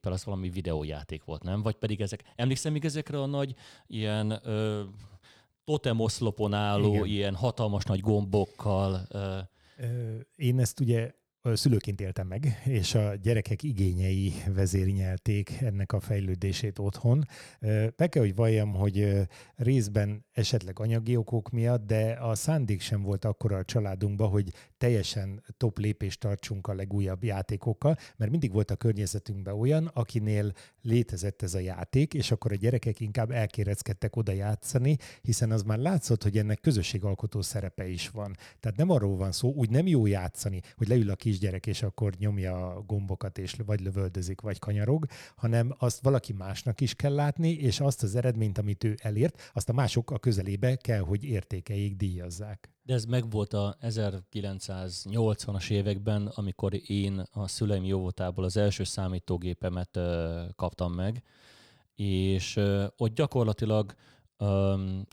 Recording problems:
uneven, jittery; strongly; from 2 s to 1:01

